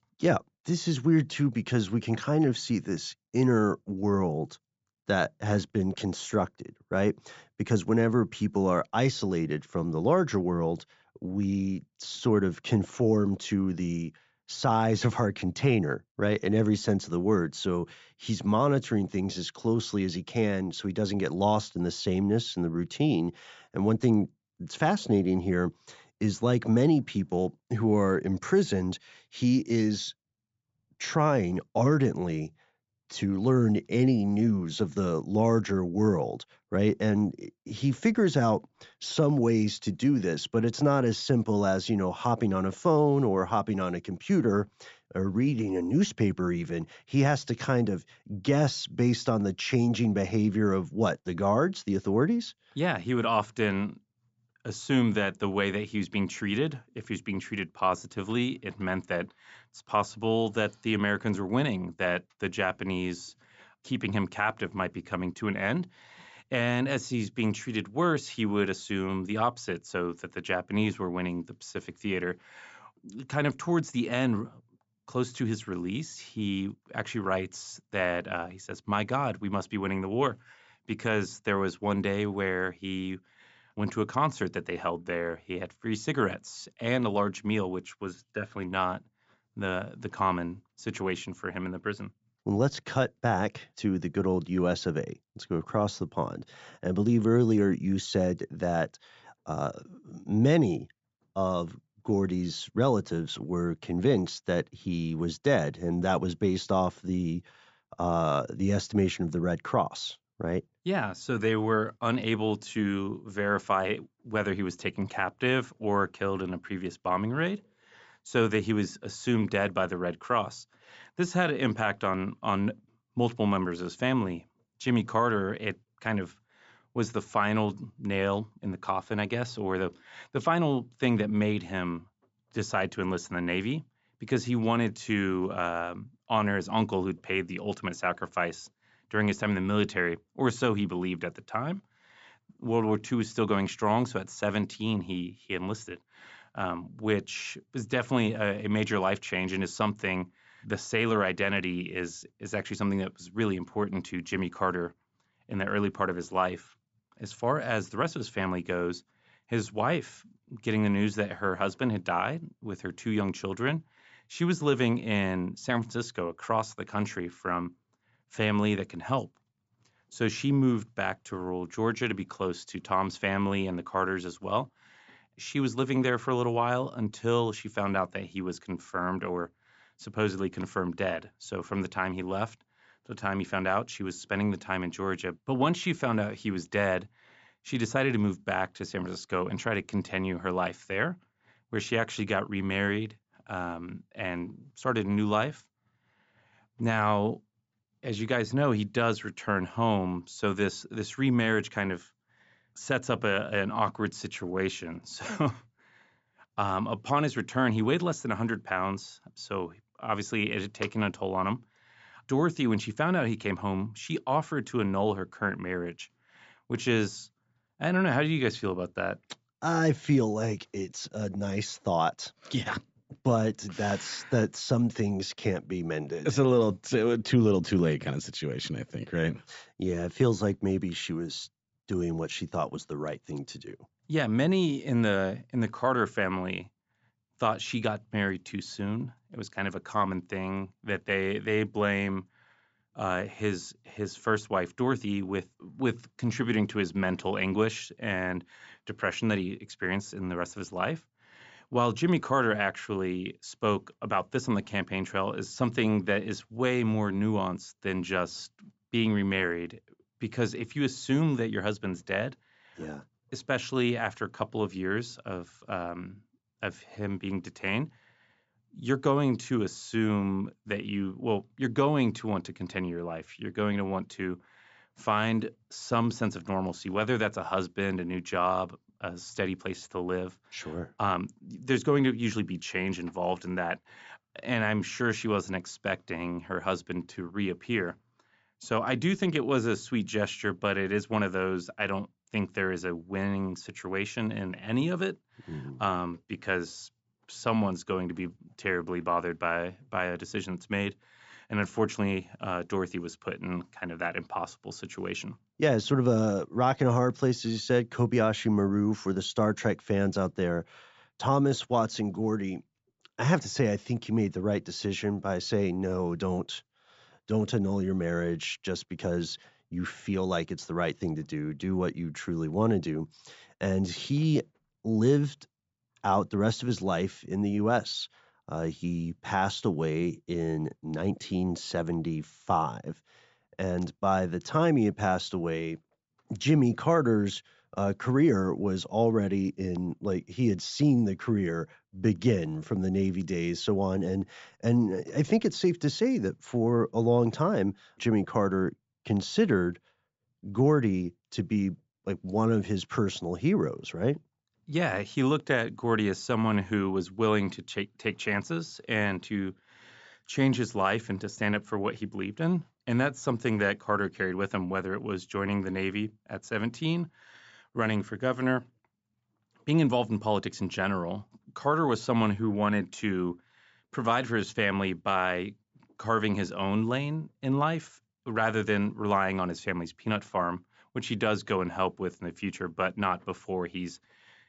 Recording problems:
high frequencies cut off; noticeable; nothing above 8 kHz

